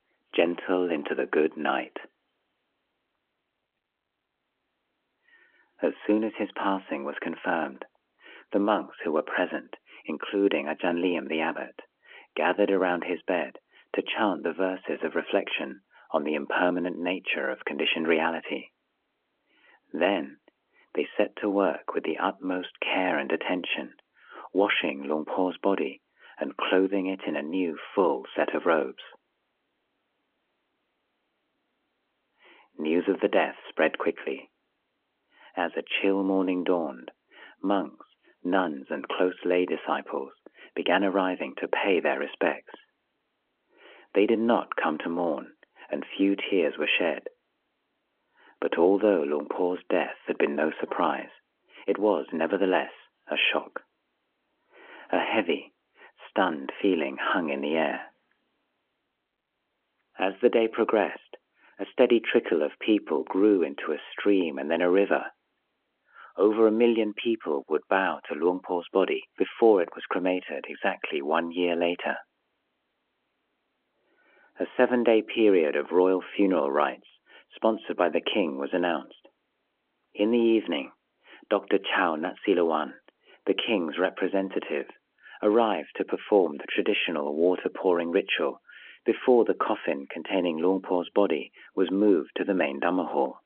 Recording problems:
phone-call audio; nothing above 3.5 kHz

